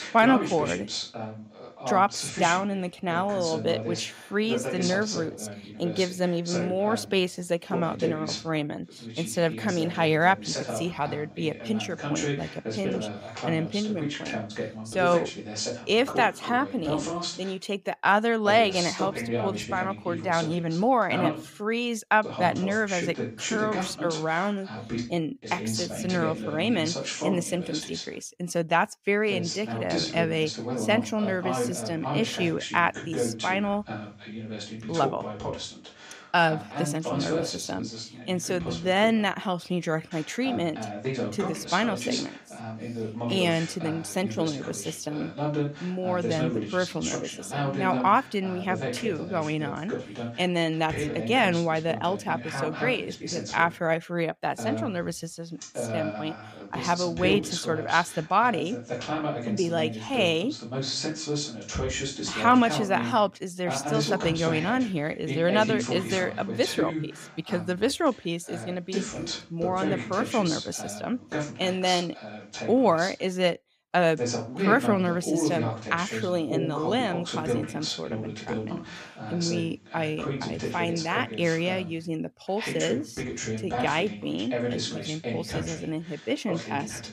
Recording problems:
voice in the background; loud; throughout; 5 dB below the speech

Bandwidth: 15.5 kHz